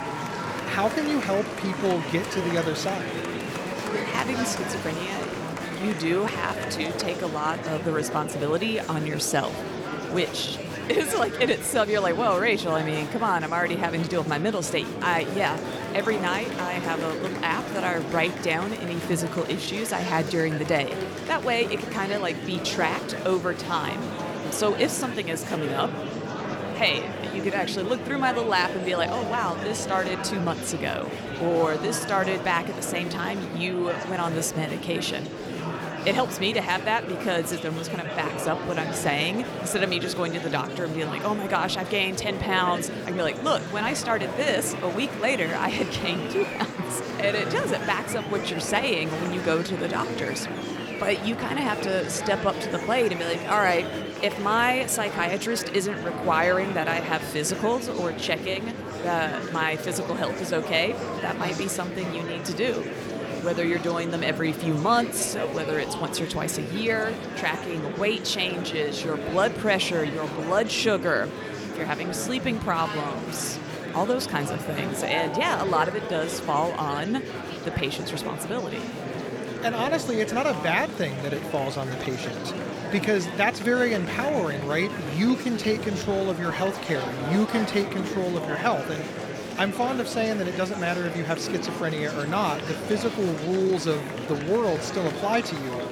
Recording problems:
murmuring crowd; loud; throughout; 5 dB below the speech

